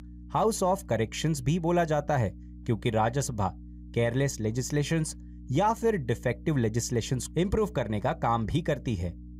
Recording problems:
electrical hum; faint; throughout; 60 Hz, 25 dB below the speech

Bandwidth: 15.5 kHz